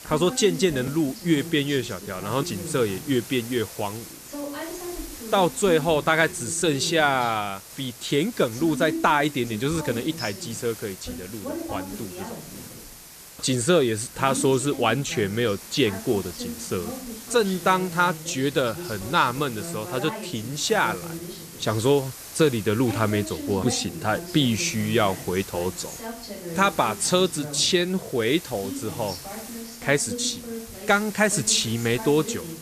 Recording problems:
voice in the background; noticeable; throughout; 15 dB below the speech
hiss; noticeable; throughout; 15 dB below the speech

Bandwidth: 14.5 kHz